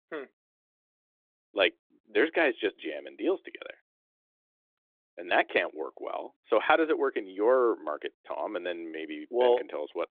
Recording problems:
phone-call audio; nothing above 3.5 kHz

